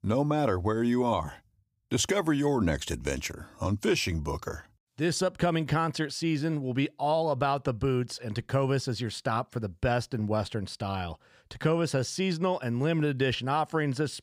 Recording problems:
none

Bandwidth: 15.5 kHz